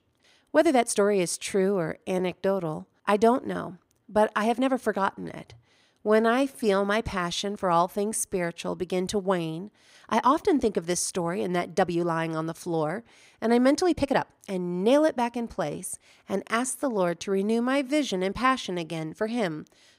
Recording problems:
uneven, jittery; strongly; from 0.5 to 19 s

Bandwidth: 15.5 kHz